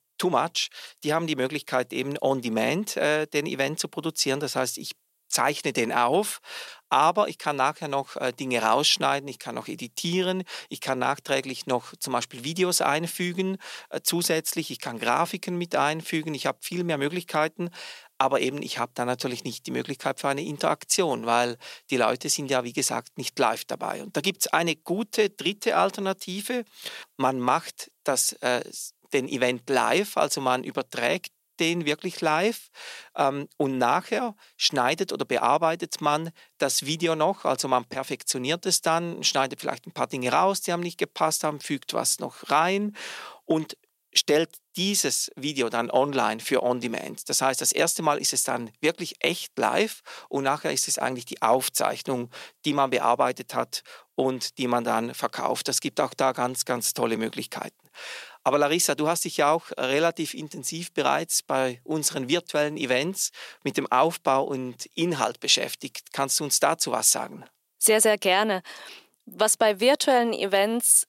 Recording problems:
thin; very; fading below 500 Hz

